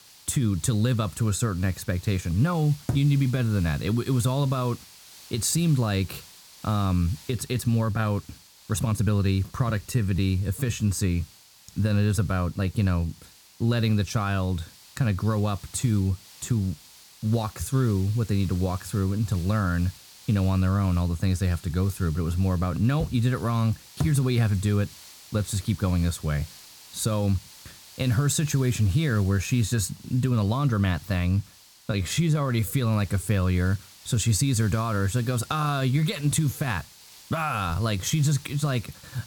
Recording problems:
hiss; faint; throughout; 20 dB below the speech
uneven, jittery; strongly; from 7 to 37 s

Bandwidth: 18 kHz